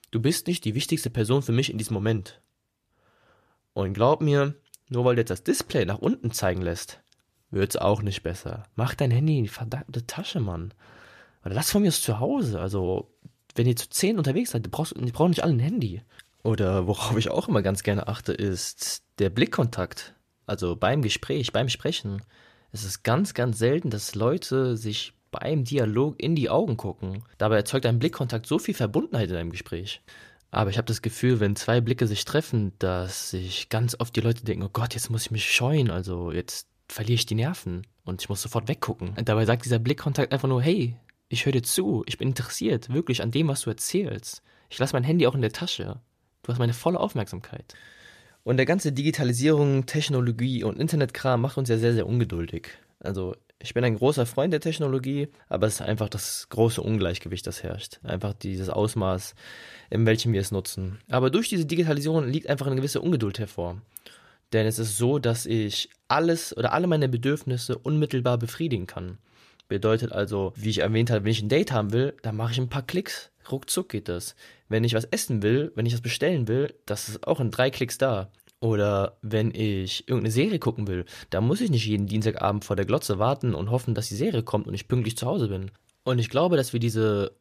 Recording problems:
none

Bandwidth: 14.5 kHz